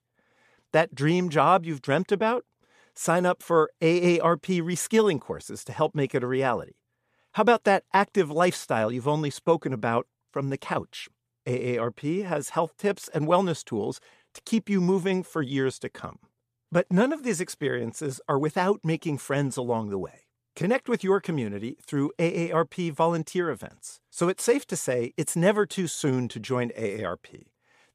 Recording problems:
none

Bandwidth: 14.5 kHz